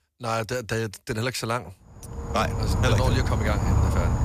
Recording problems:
animal sounds; very loud; from 2.5 s on; 2 dB above the speech

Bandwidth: 14.5 kHz